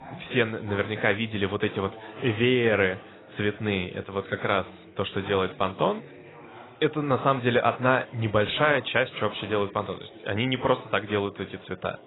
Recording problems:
garbled, watery; badly; nothing above 4 kHz
background chatter; faint; throughout; 4 voices, 20 dB below the speech

